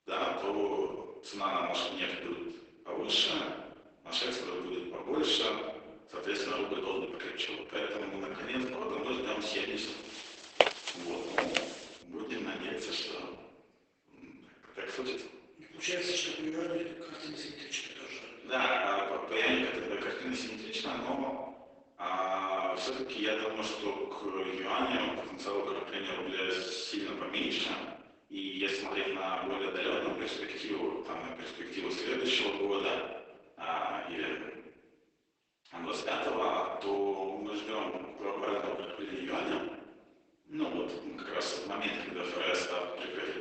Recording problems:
off-mic speech; far
garbled, watery; badly; nothing above 8 kHz
room echo; noticeable; dies away in 1 s
thin; somewhat; fading below 350 Hz
uneven, jittery; strongly; from 6.5 to 42 s
footsteps; loud; at 11 s; peak 7 dB above the speech

